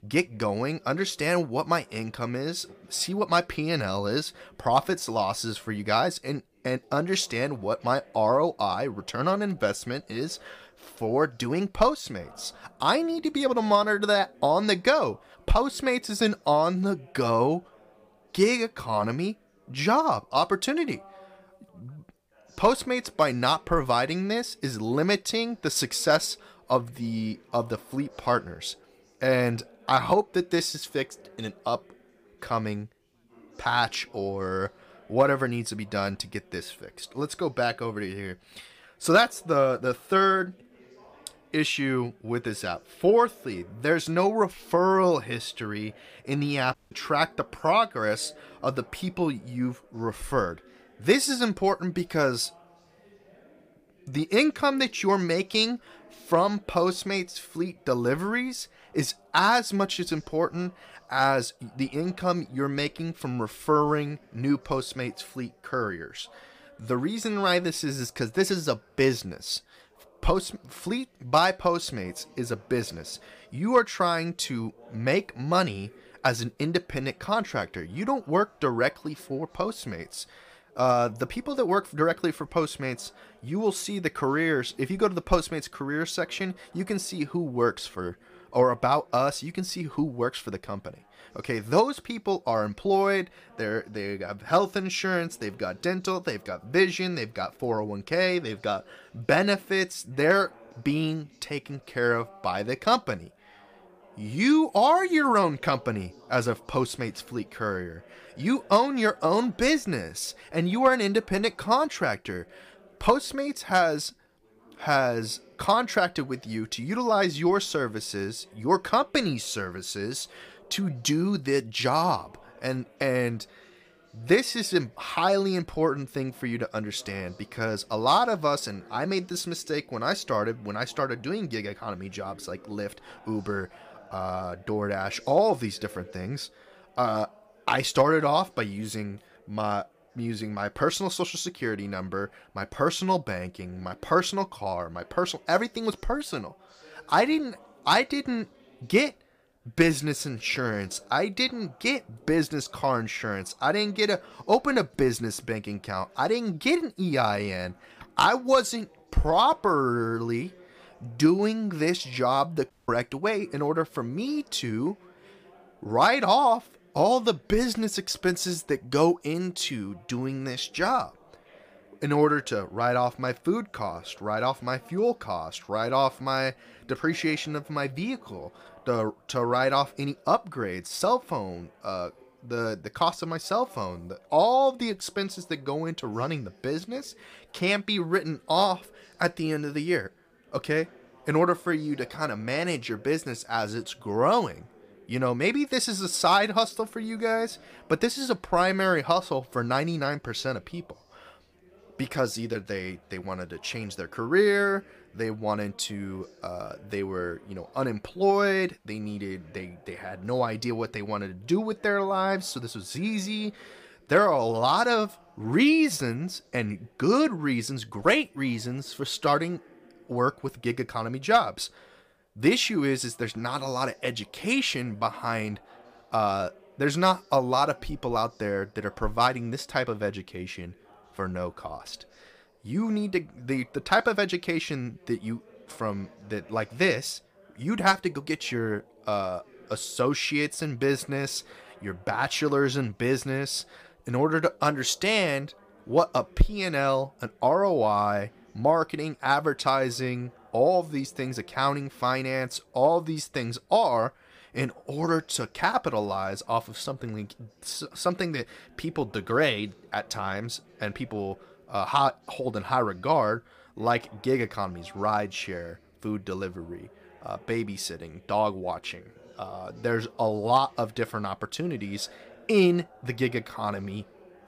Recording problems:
background chatter; faint; throughout; 3 voices, 30 dB below the speech
audio cutting out; at 47 s and at 2:43

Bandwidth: 15 kHz